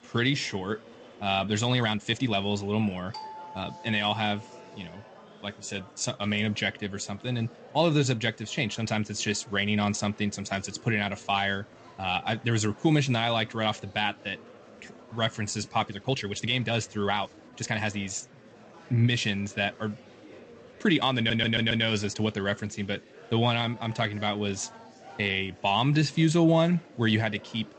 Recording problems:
garbled, watery; slightly; nothing above 8 kHz
murmuring crowd; faint; throughout; 25 dB below the speech
uneven, jittery; strongly; from 1.5 to 24 s
doorbell; faint; from 3 to 4.5 s; peak 15 dB below the speech
audio stuttering; at 21 s

